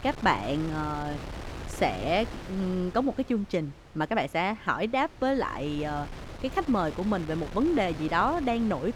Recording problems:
wind noise on the microphone; occasional gusts; 15 dB below the speech

